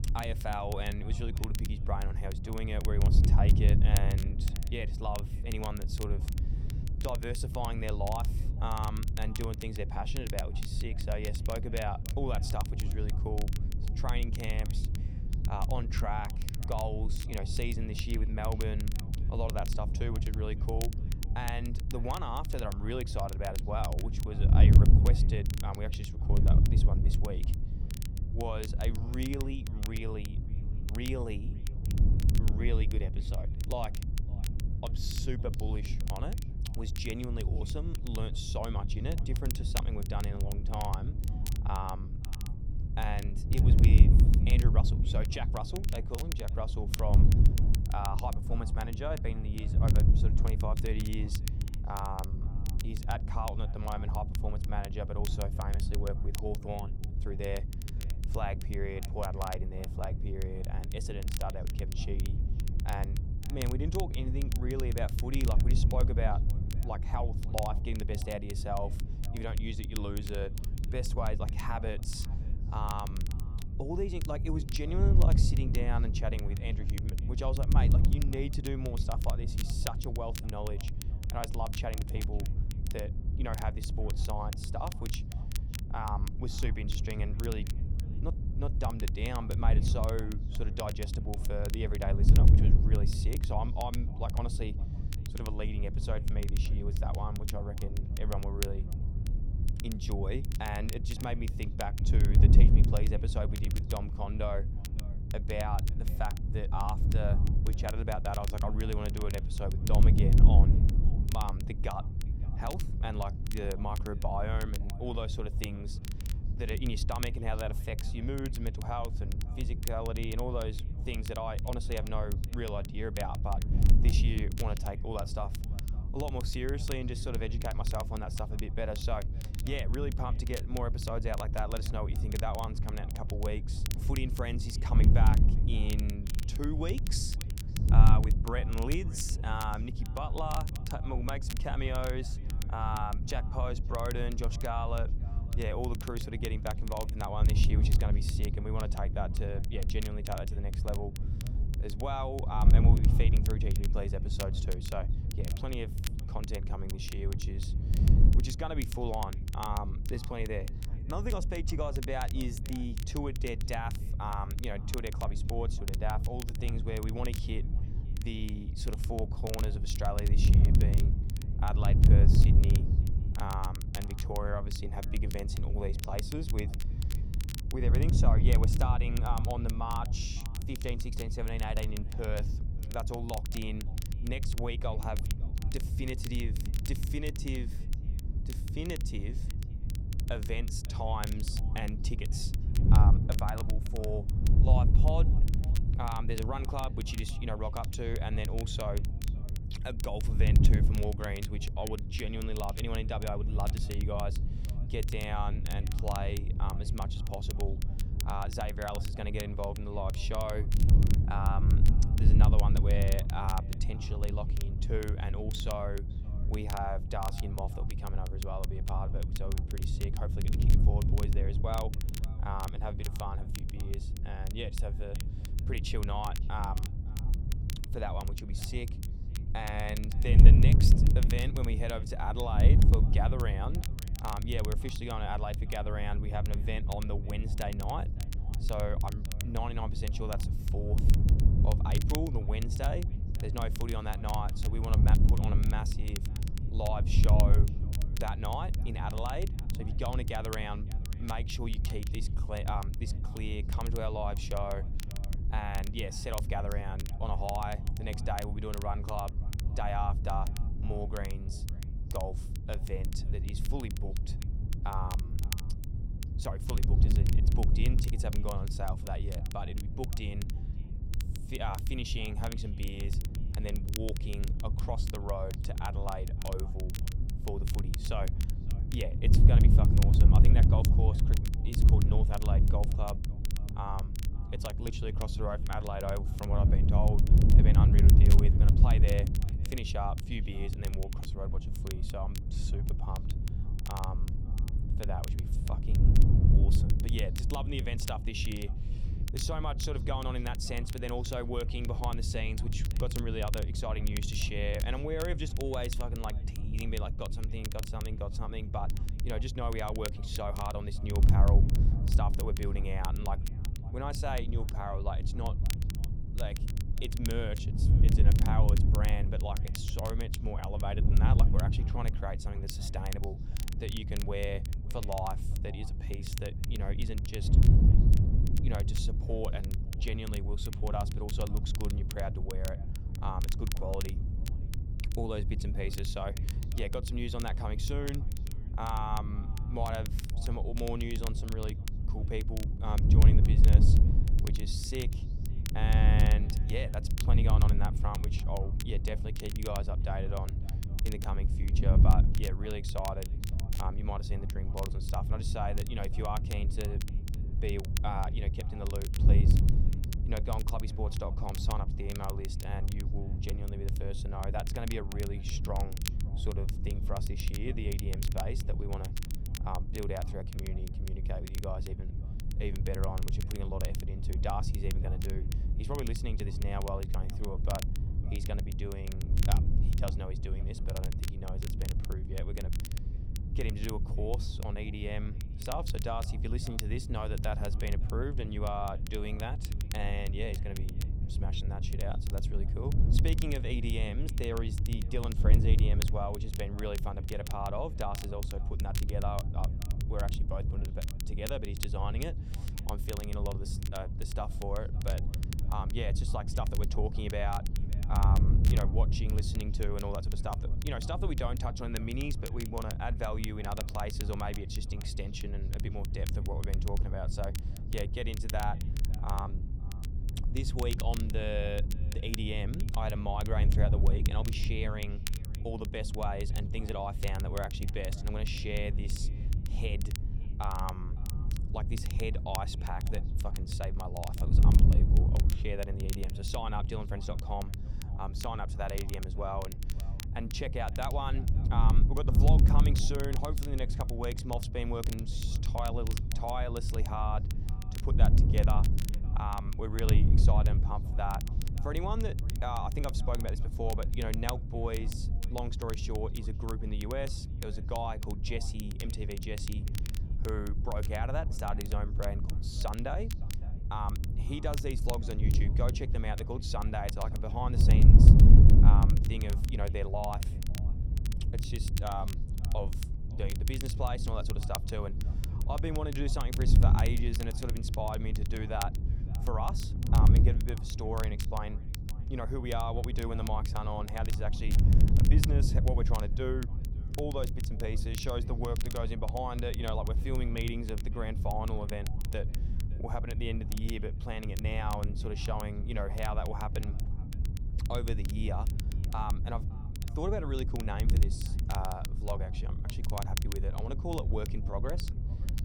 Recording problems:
echo of what is said; faint; throughout; 560 ms later, 25 dB below the speech
wind noise on the microphone; heavy; 8 dB below the speech
crackle, like an old record; loud; 9 dB below the speech

